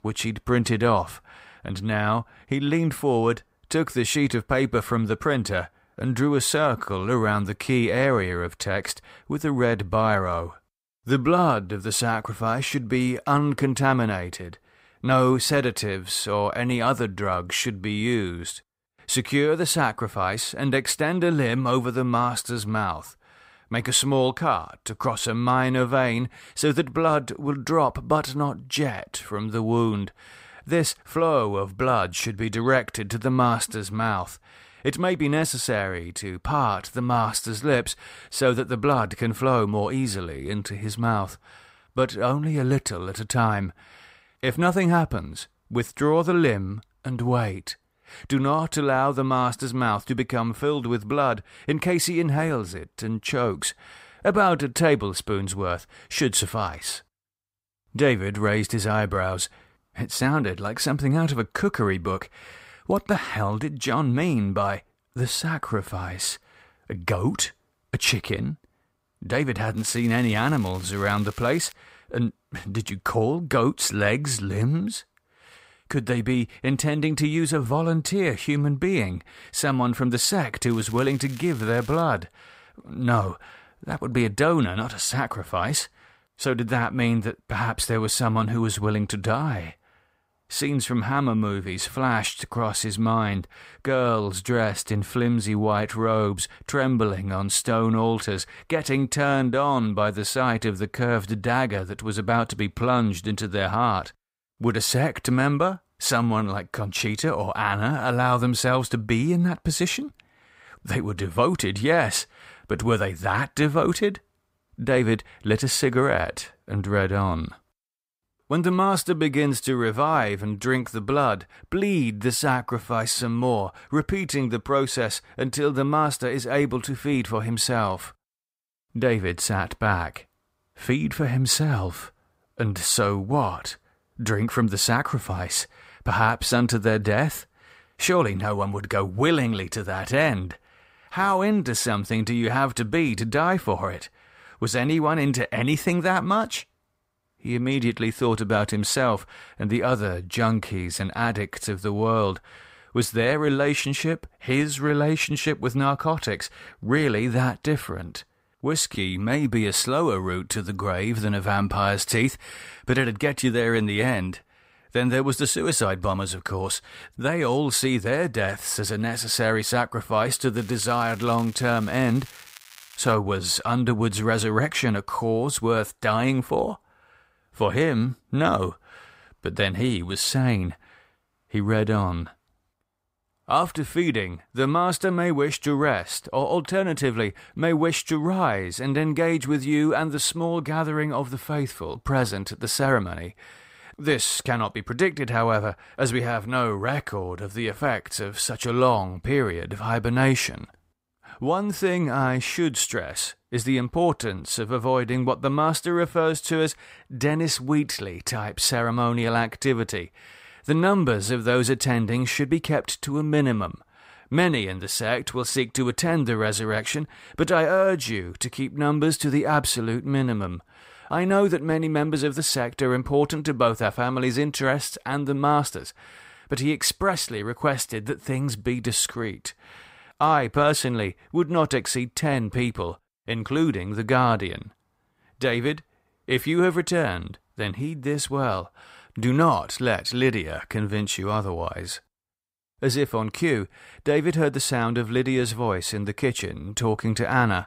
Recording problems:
crackling; faint; from 1:10 to 1:12, from 1:21 to 1:22 and from 2:51 to 2:53; 20 dB below the speech

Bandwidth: 15.5 kHz